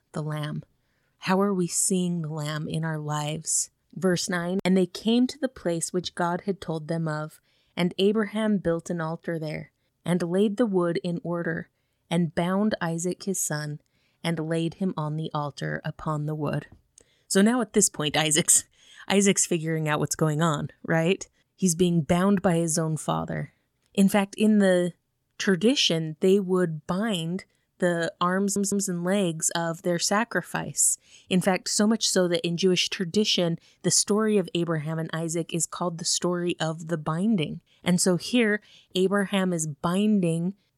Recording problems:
audio stuttering; at 28 s

